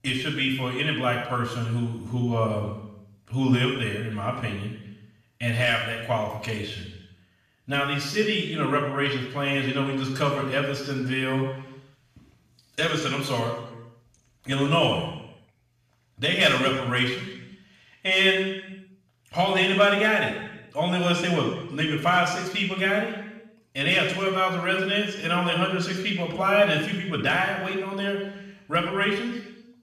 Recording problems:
off-mic speech; far
room echo; noticeable; dies away in 0.9 s

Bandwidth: 14.5 kHz